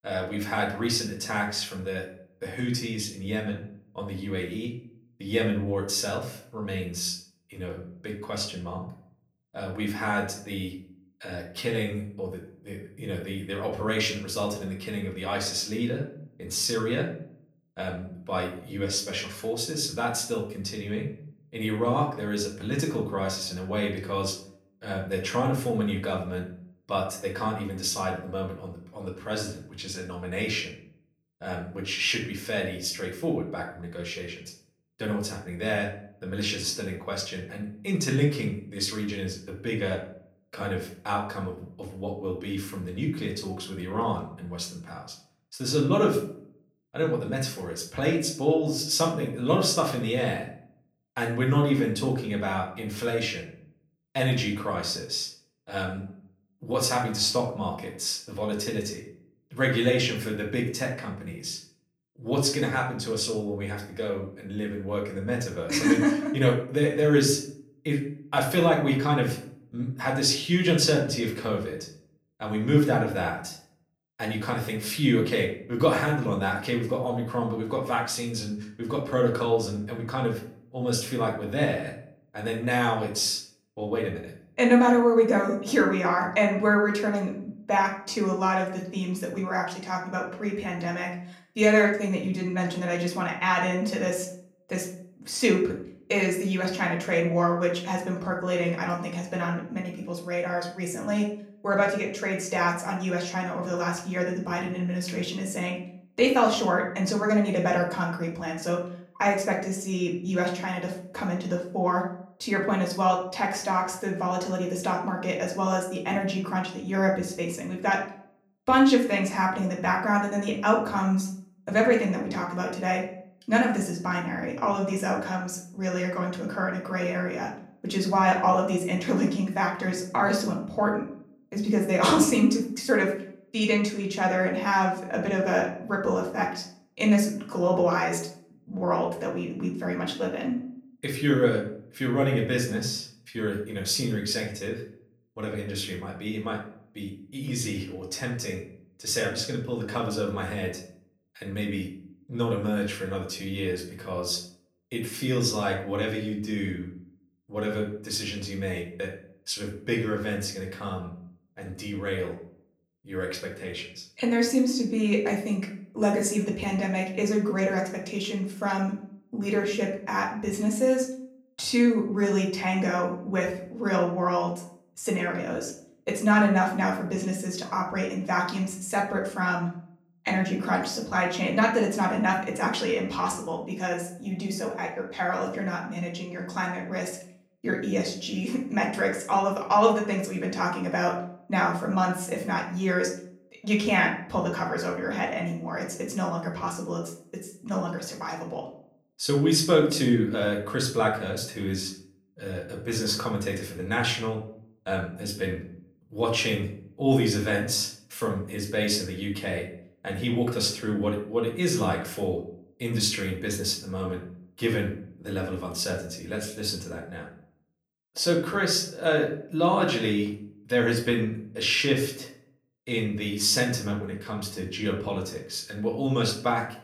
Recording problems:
off-mic speech; far
room echo; slight; dies away in 0.4 s

